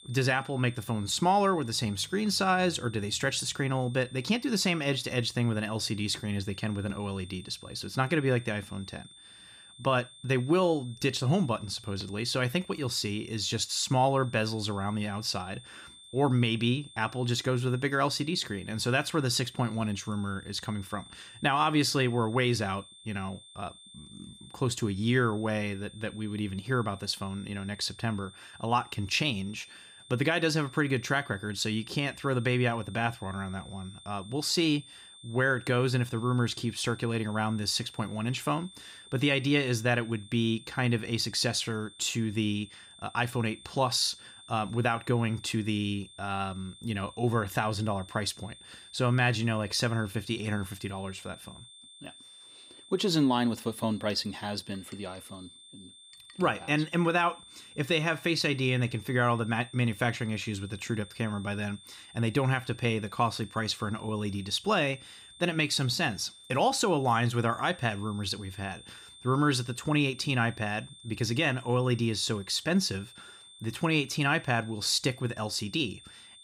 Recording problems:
high-pitched whine; faint; throughout; 3.5 kHz, 20 dB below the speech

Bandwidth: 15.5 kHz